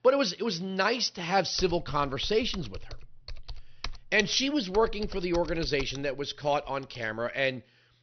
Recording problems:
high frequencies cut off; noticeable; nothing above 6 kHz
keyboard typing; faint; from 1.5 to 7 s; peak 10 dB below the speech

